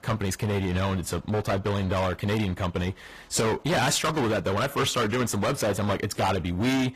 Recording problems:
distortion; heavy; 24% of the sound clipped
garbled, watery; slightly; nothing above 15 kHz

